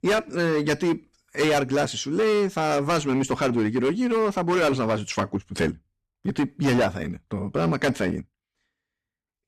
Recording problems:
distortion; heavy; 13% of the sound clipped

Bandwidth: 14.5 kHz